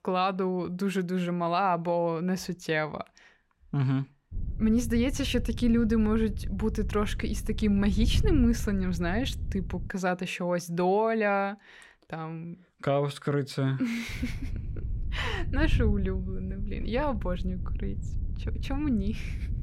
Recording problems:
wind noise on the microphone; occasional gusts; from 4.5 to 10 s and from 14 s on; 20 dB below the speech

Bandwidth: 16 kHz